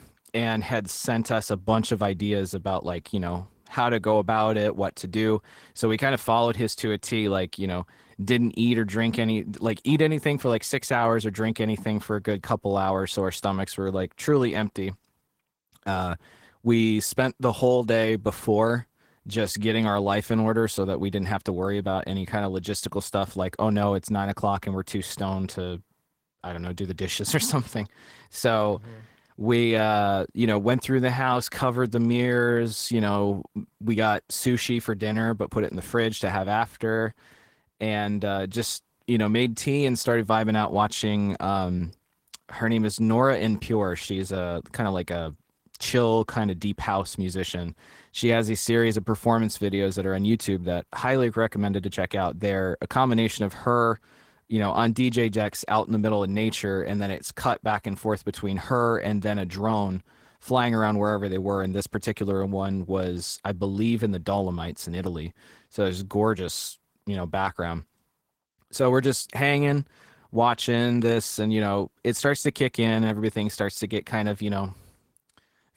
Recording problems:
garbled, watery; slightly; nothing above 16 kHz

